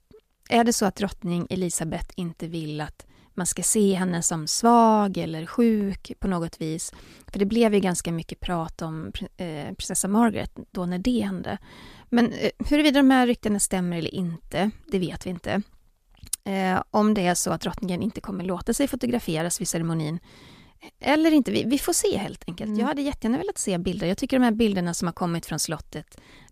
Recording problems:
none

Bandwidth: 14.5 kHz